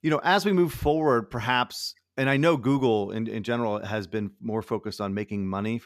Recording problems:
none

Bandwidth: 14.5 kHz